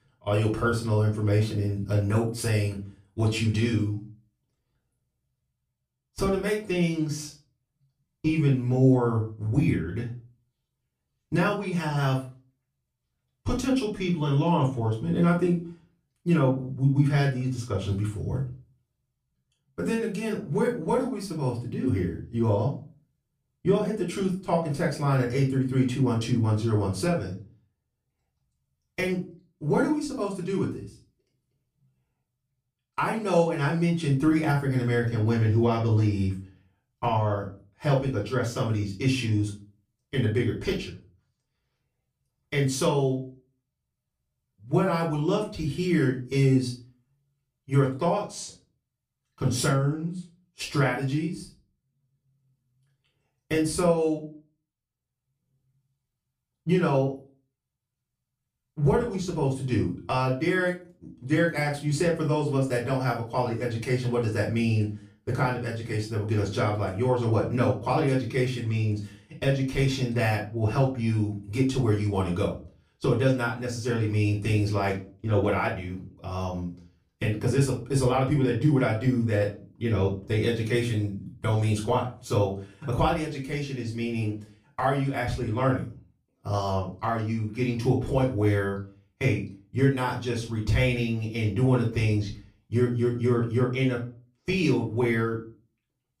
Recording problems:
off-mic speech; far
room echo; slight; dies away in 0.3 s

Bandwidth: 15 kHz